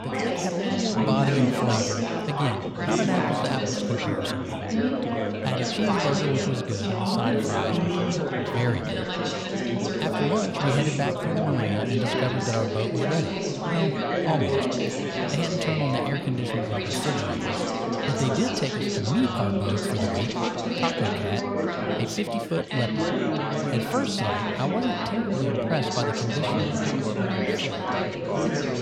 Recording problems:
chatter from many people; very loud; throughout; 3 dB above the speech

